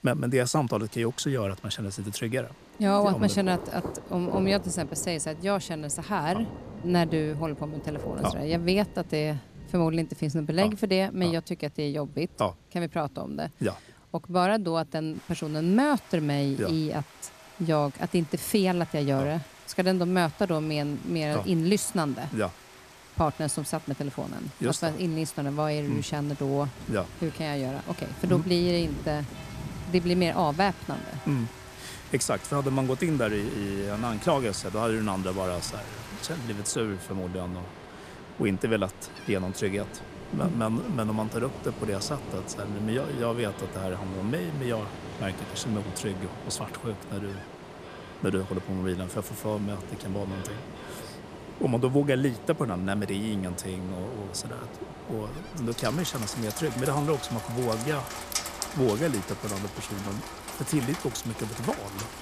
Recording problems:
rain or running water; noticeable; throughout; 10 dB below the speech
alarms or sirens; faint; throughout; 25 dB below the speech

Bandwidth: 14.5 kHz